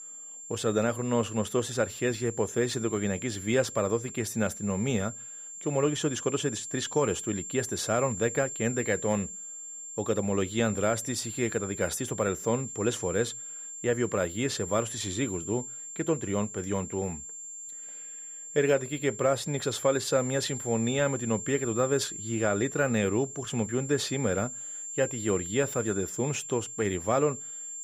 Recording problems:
high-pitched whine; loud; throughout; 7.5 kHz, 8 dB below the speech

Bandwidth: 15.5 kHz